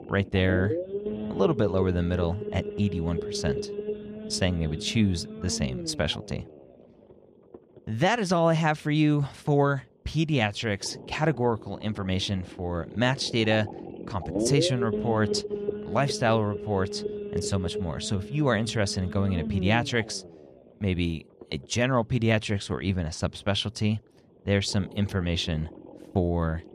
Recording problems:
low rumble; loud; throughout; 8 dB below the speech

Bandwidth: 14 kHz